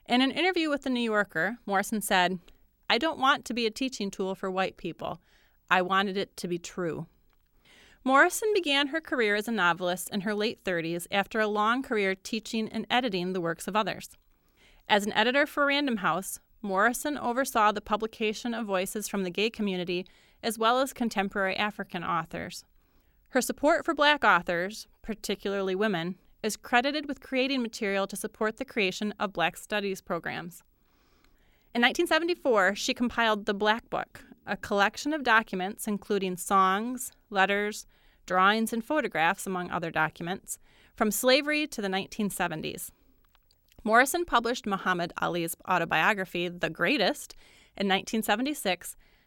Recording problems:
uneven, jittery; strongly; from 1.5 to 39 s

